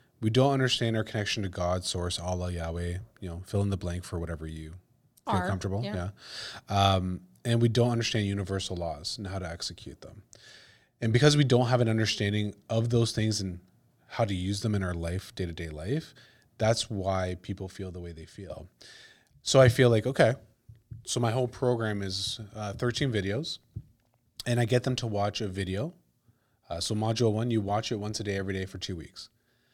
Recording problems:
none

